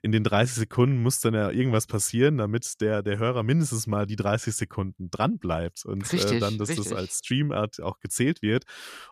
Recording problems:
none

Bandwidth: 14 kHz